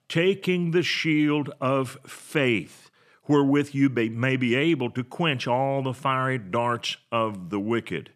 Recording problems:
none

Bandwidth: 14 kHz